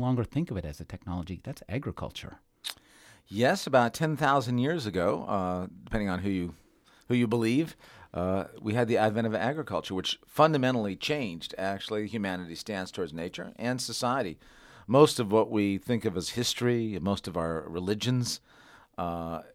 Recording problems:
abrupt cut into speech; at the start

